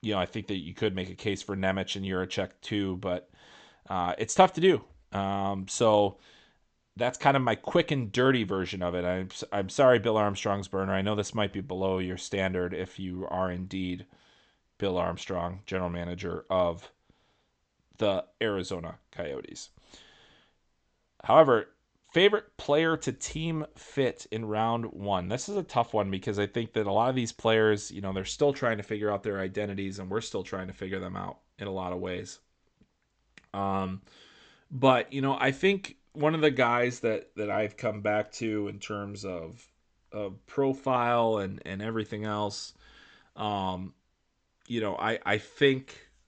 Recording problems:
high frequencies cut off; noticeable; nothing above 8 kHz

